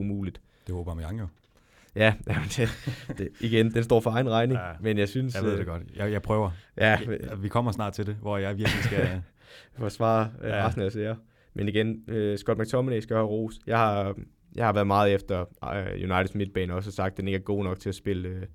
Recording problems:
abrupt cut into speech; at the start

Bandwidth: 17 kHz